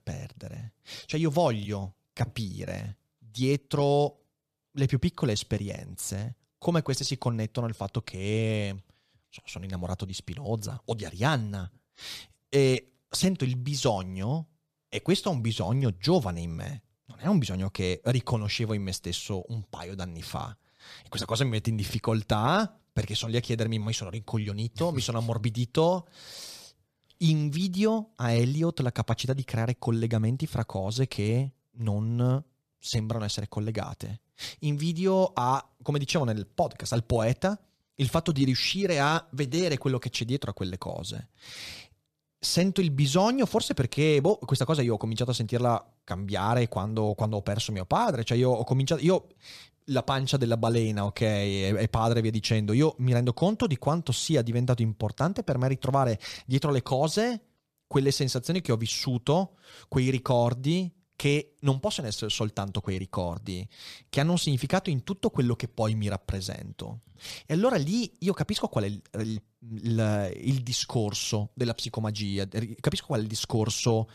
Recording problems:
none

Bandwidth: 14.5 kHz